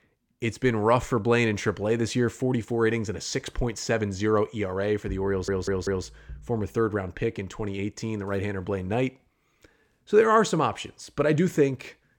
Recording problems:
audio stuttering; at 5.5 s

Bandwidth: 17.5 kHz